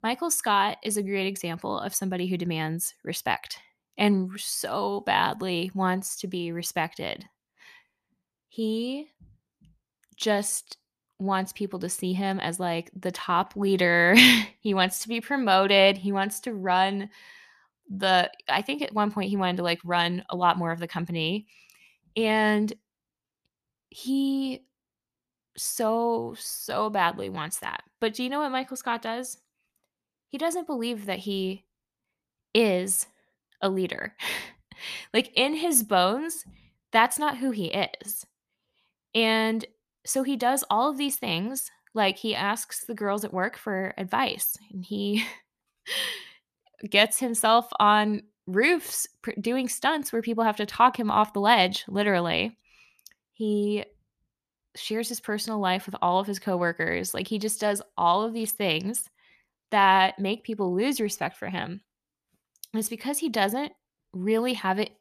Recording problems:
none

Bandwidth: 14.5 kHz